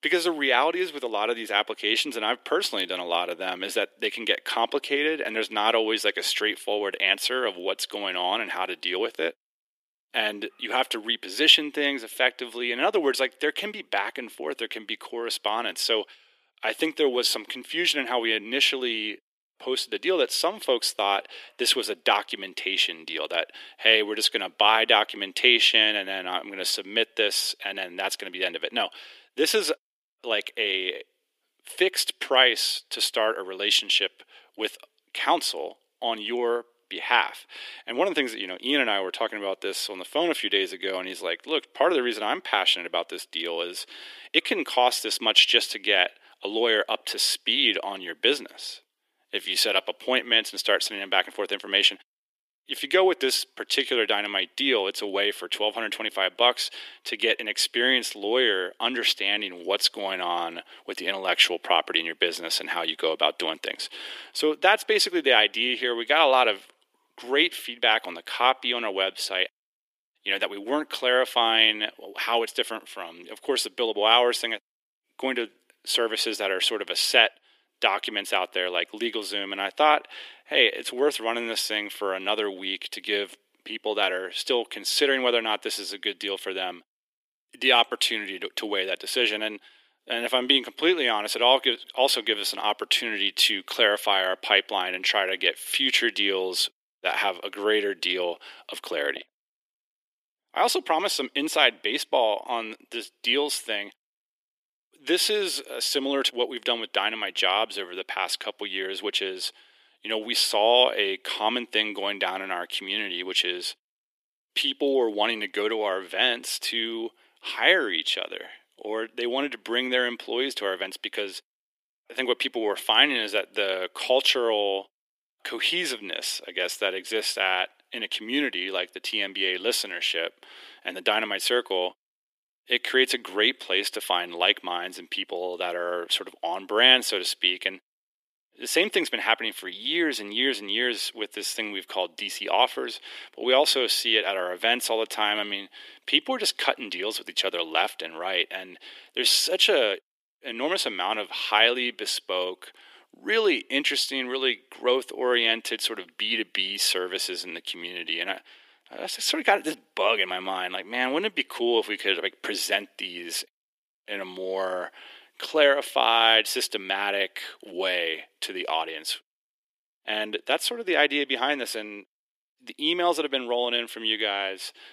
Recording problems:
thin; very; fading below 350 Hz

